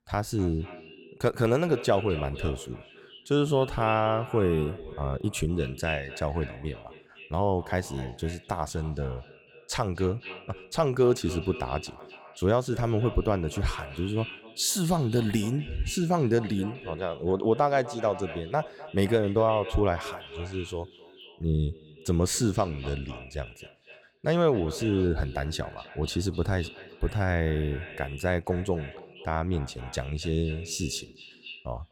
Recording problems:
echo of what is said; noticeable; throughout; 250 ms later, 15 dB below the speech

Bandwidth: 17 kHz